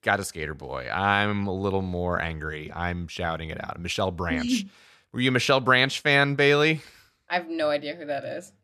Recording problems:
none

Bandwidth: 13.5 kHz